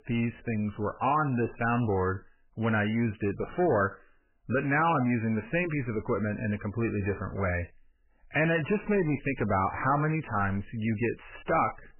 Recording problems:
garbled, watery; badly; nothing above 3 kHz
distortion; slight; 10 dB below the speech

